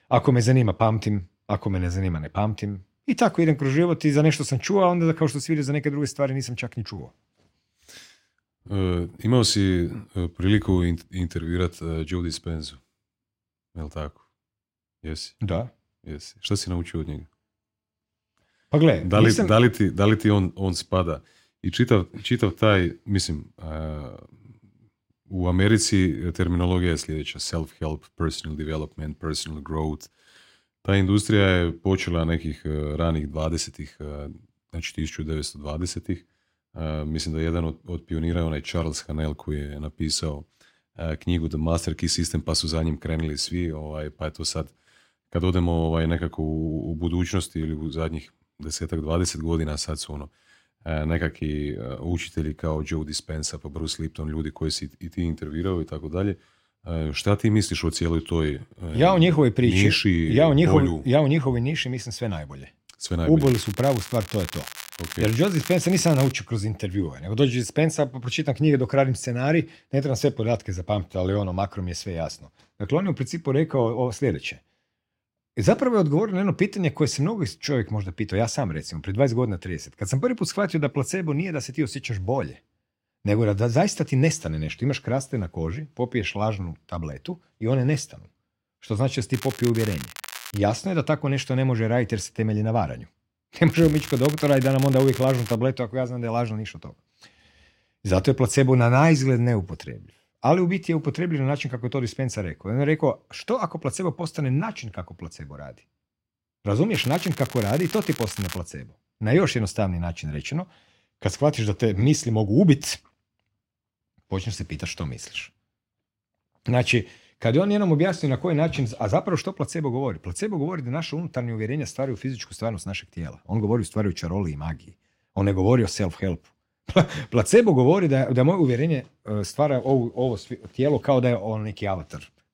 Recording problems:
crackling; noticeable; 4 times, first at 1:03; 15 dB below the speech

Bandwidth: 16 kHz